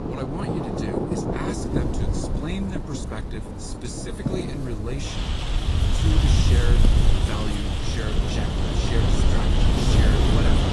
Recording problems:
garbled, watery; slightly
rain or running water; very loud; throughout; 2 dB above the speech
wind noise on the microphone; heavy; 1 dB above the speech

